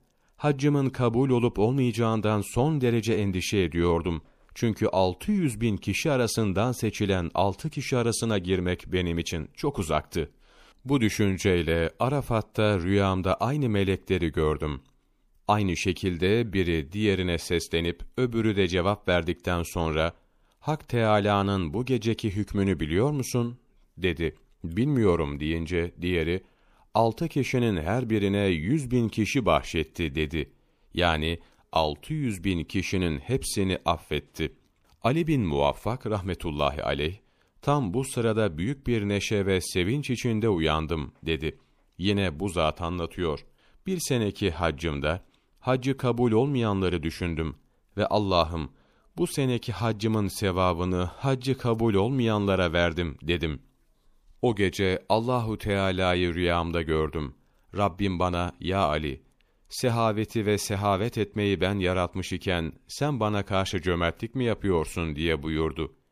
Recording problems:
none

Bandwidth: 15 kHz